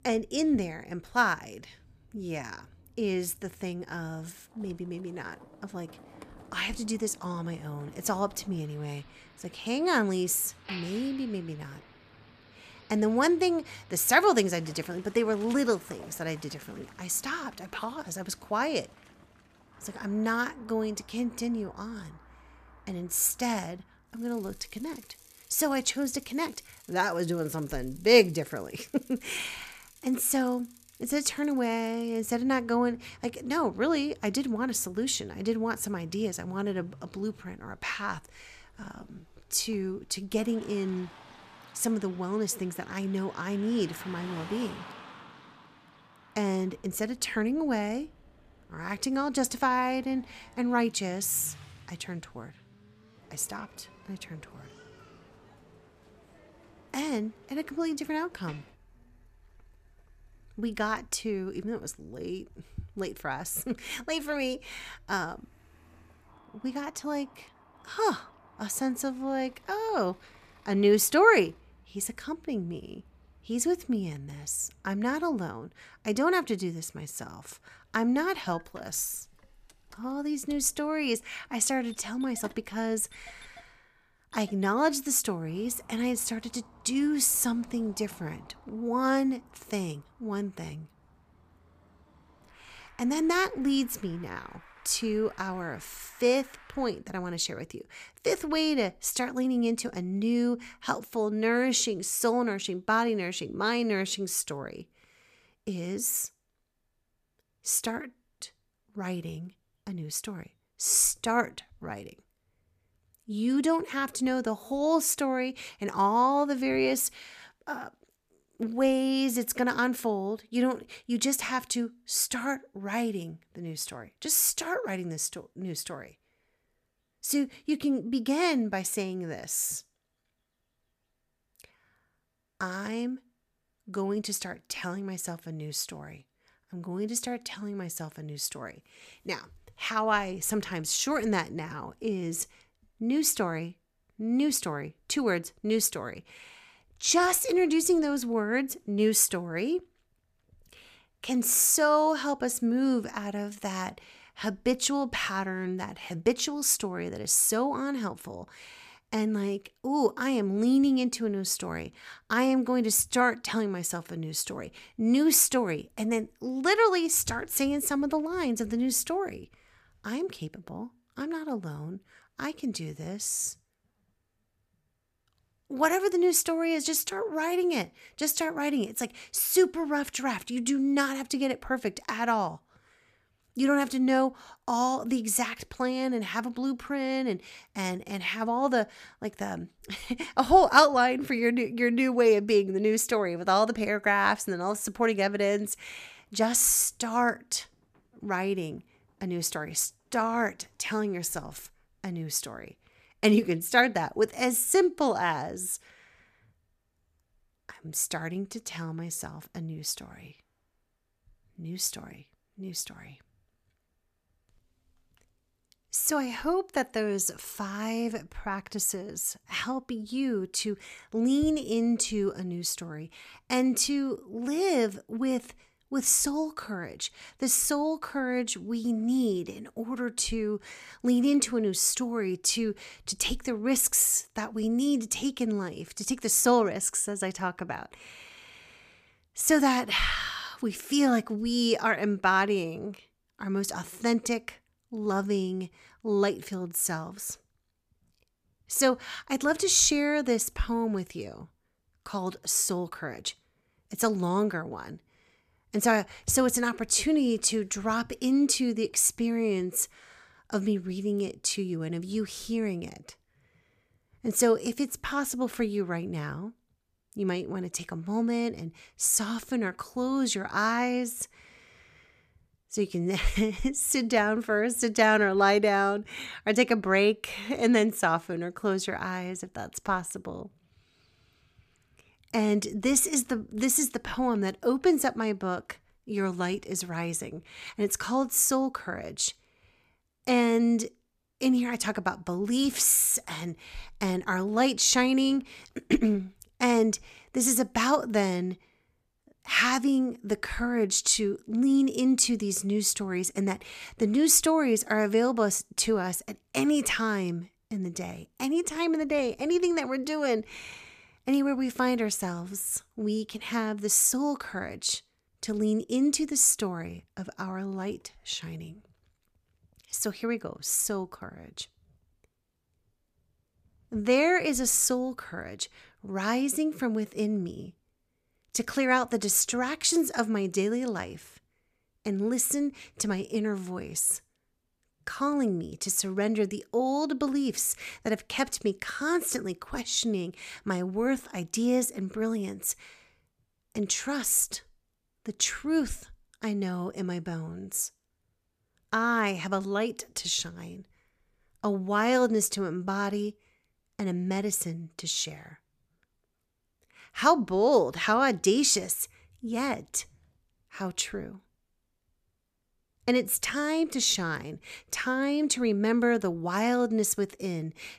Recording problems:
traffic noise; faint; until 1:37; 25 dB below the speech

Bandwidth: 14.5 kHz